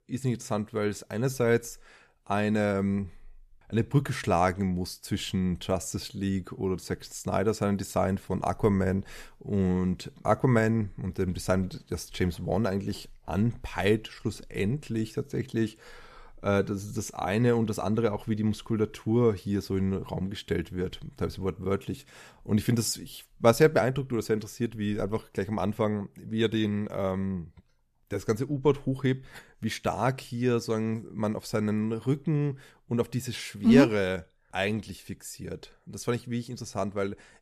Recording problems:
none

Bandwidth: 14.5 kHz